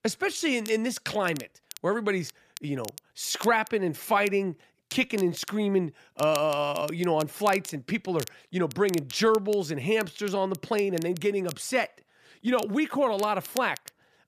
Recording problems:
crackle, like an old record; noticeable; 15 dB below the speech

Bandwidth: 14.5 kHz